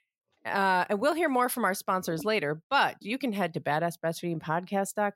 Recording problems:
none

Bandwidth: 16 kHz